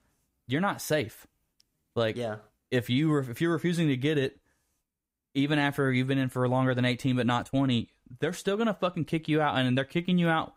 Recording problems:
none

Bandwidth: 15.5 kHz